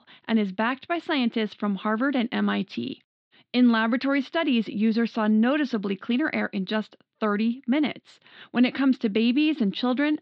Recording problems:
muffled; slightly; fading above 4 kHz

